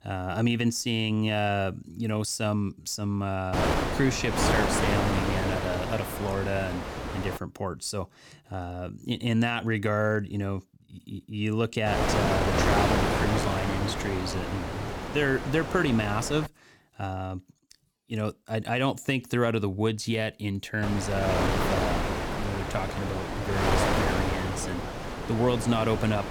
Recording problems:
wind noise on the microphone; heavy; from 3.5 to 7.5 s, from 12 to 16 s and from 21 s on; 1 dB above the speech

